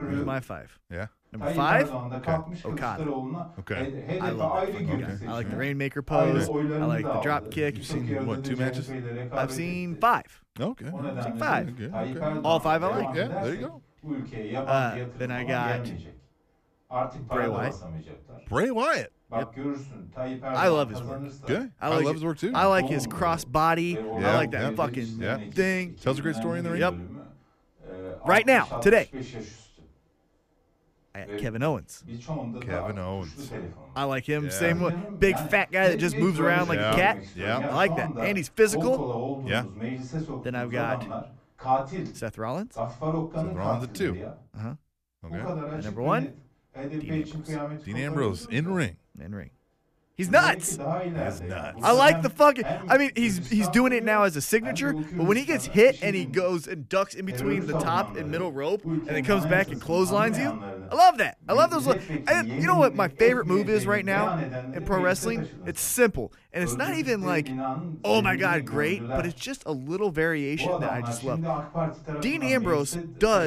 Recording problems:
voice in the background; loud; throughout; 7 dB below the speech
abrupt cut into speech; at the end

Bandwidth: 14.5 kHz